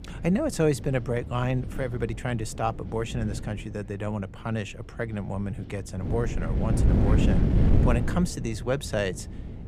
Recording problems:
wind noise on the microphone; heavy; 6 dB below the speech

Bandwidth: 15 kHz